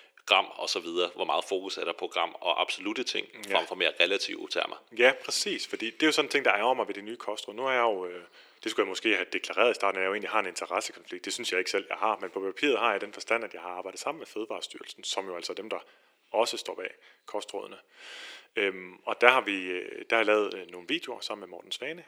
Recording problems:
thin; very; fading below 350 Hz

